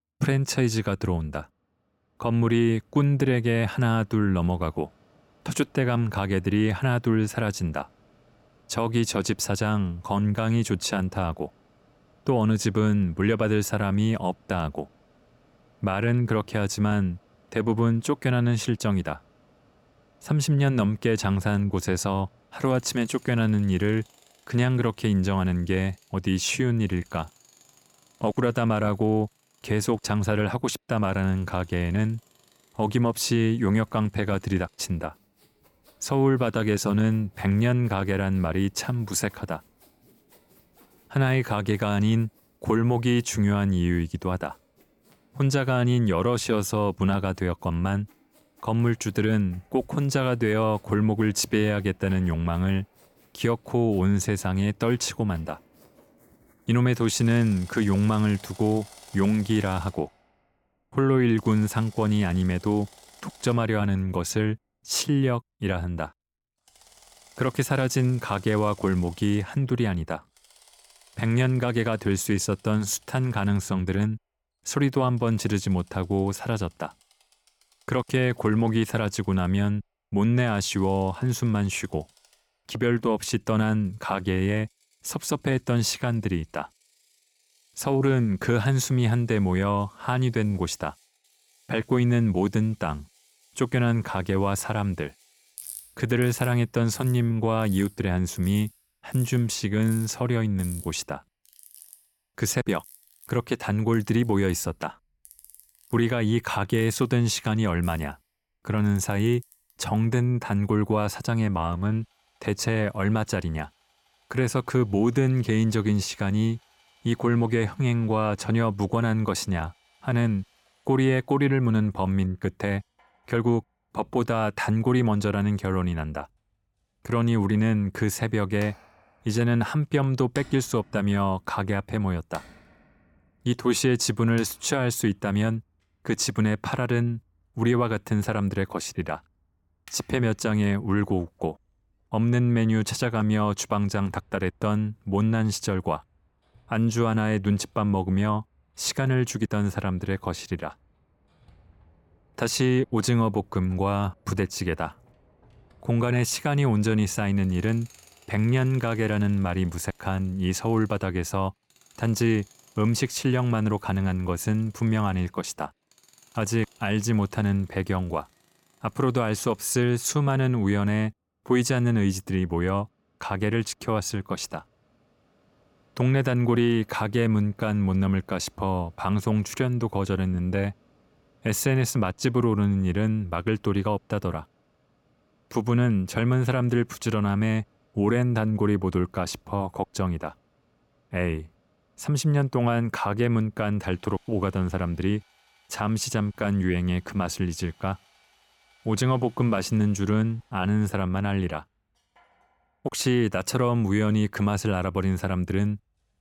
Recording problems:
machinery noise; faint; throughout; 30 dB below the speech

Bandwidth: 17 kHz